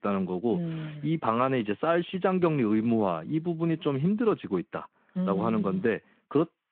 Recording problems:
phone-call audio

